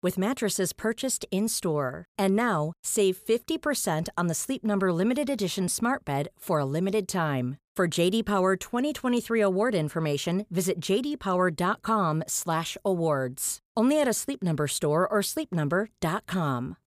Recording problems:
none

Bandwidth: 15 kHz